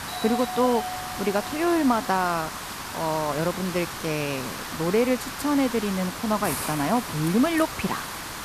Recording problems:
hiss; loud; throughout; 7 dB below the speech
doorbell; noticeable; until 2.5 s; peak 6 dB below the speech

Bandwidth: 14.5 kHz